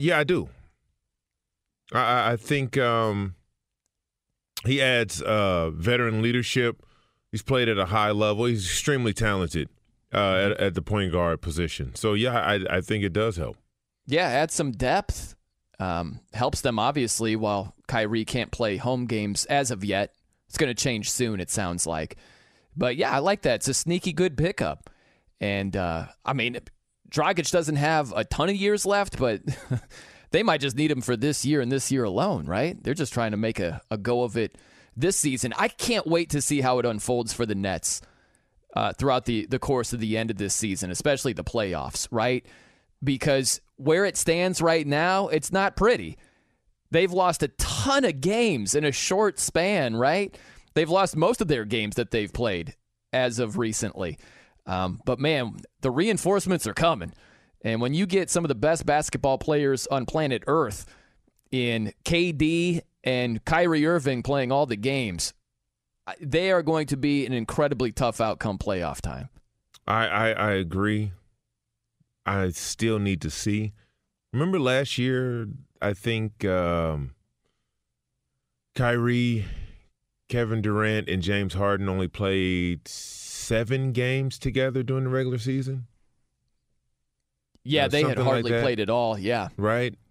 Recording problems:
abrupt cut into speech; at the start

